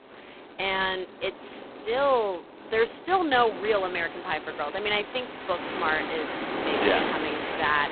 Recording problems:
phone-call audio; poor line; nothing above 4 kHz
wind in the background; loud; throughout; 6 dB below the speech

